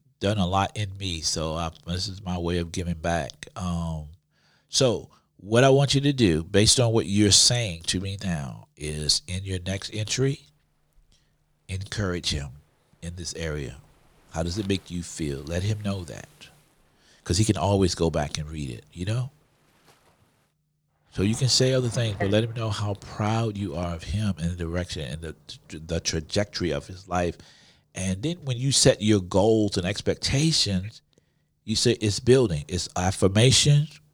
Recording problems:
rain or running water; faint; from 9.5 s on; 25 dB below the speech

